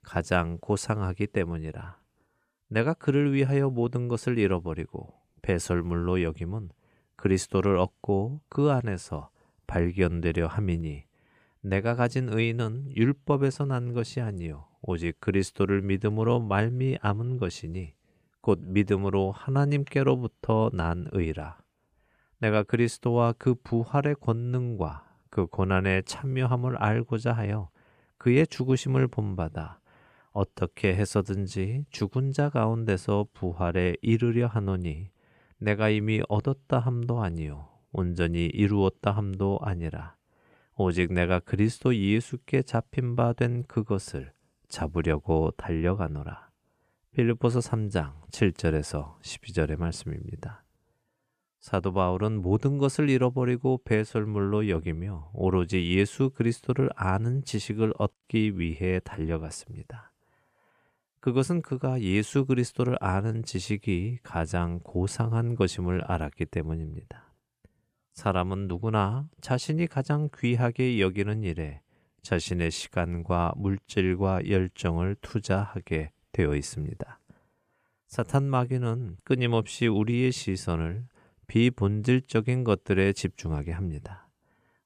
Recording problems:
none

